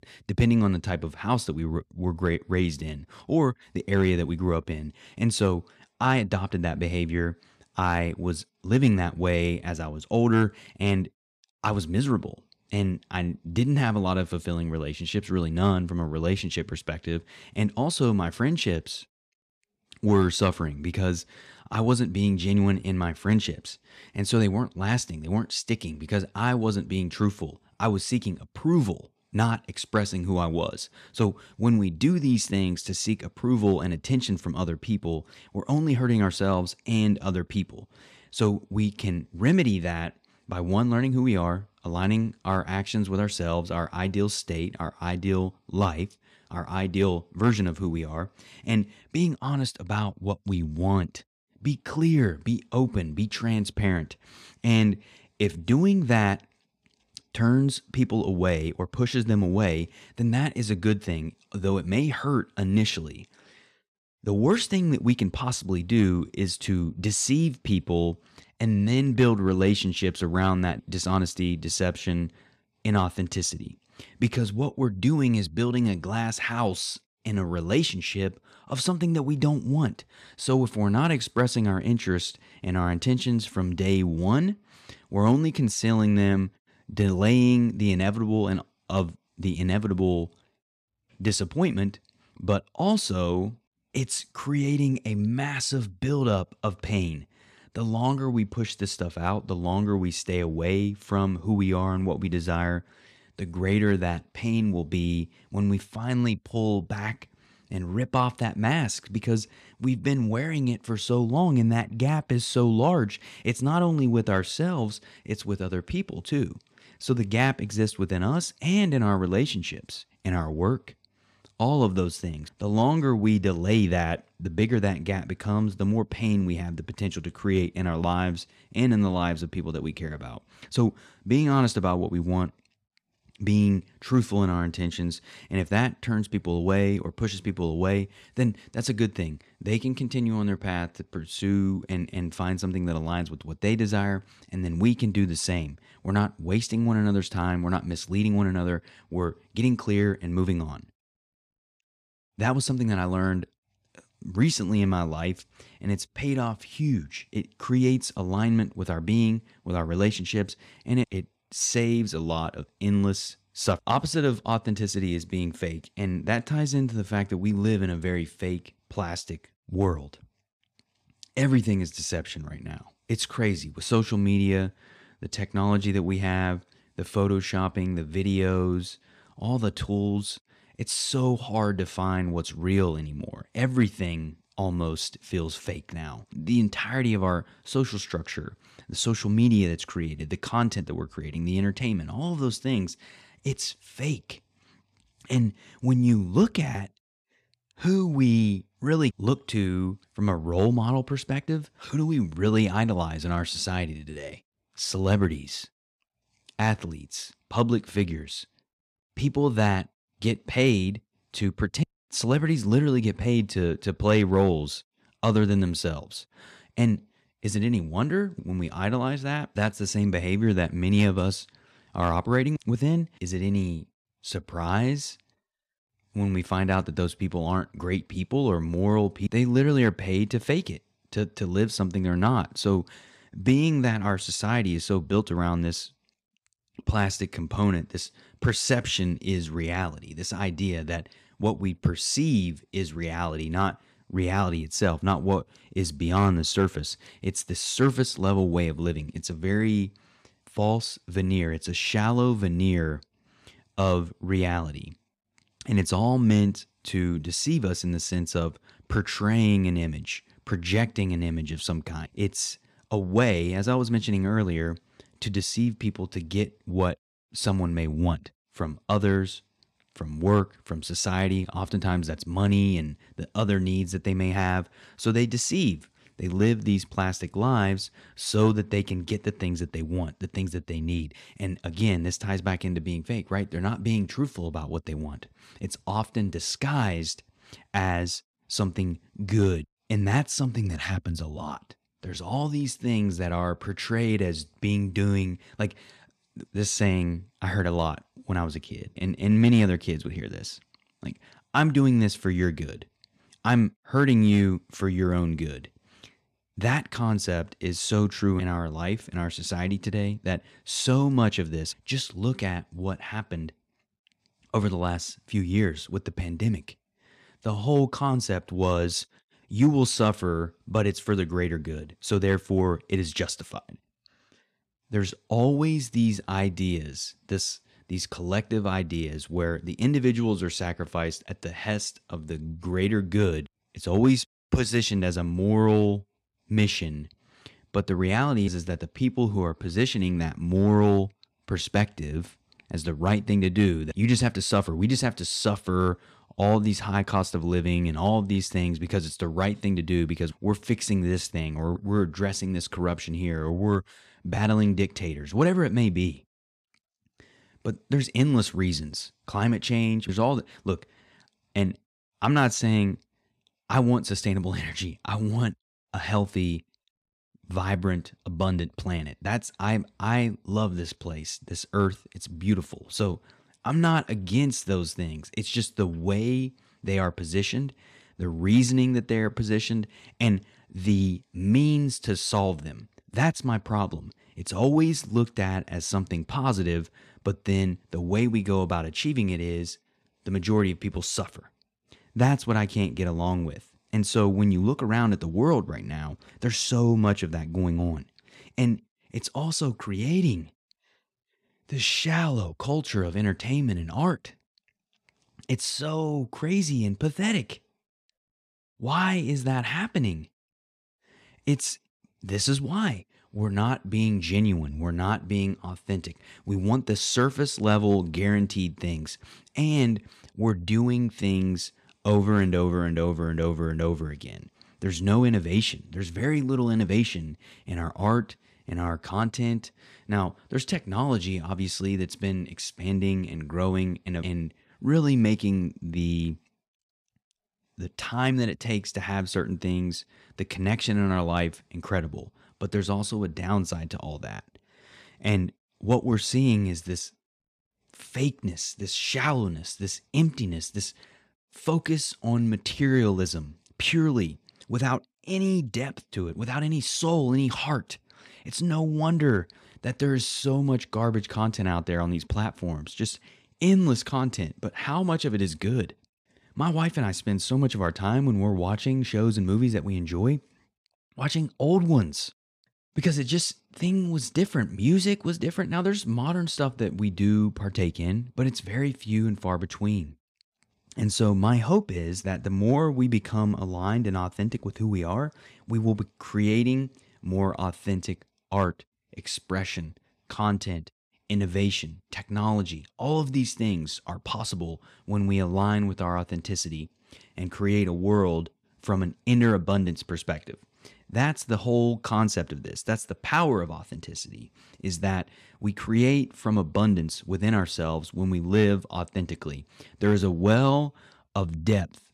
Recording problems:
none

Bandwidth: 14.5 kHz